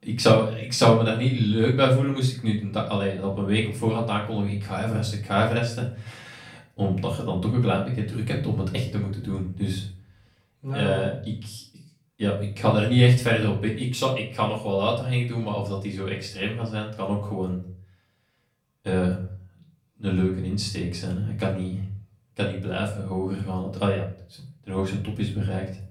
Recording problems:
off-mic speech; far
room echo; slight; dies away in 0.4 s

